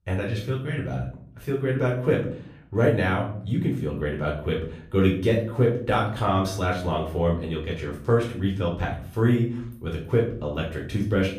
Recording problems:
off-mic speech; far
room echo; slight; dies away in 0.5 s

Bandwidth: 15 kHz